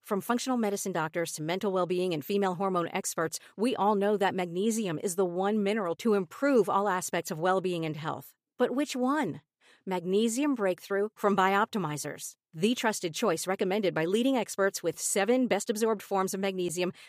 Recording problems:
none

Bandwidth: 15 kHz